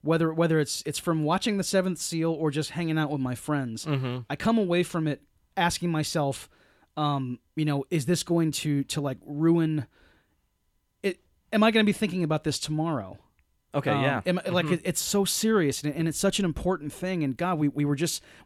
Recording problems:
none

